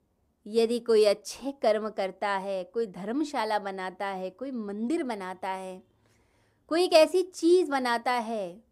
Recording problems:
none

